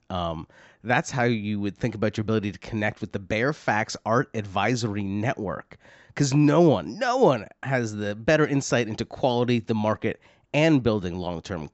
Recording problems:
high frequencies cut off; noticeable; nothing above 7.5 kHz

